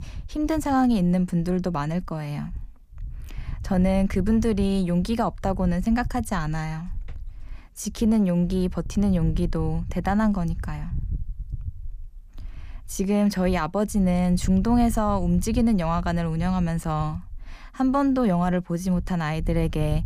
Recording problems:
wind noise on the microphone; occasional gusts; 25 dB below the speech

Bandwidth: 15 kHz